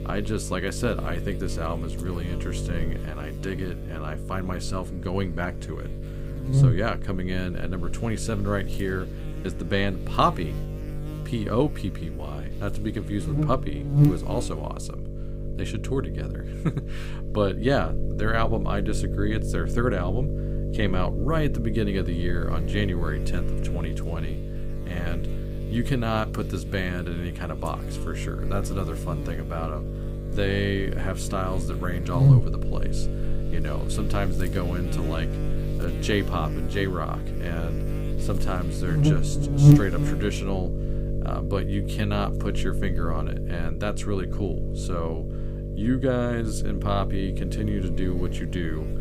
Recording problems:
electrical hum; loud; throughout; 50 Hz, 6 dB below the speech

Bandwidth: 15.5 kHz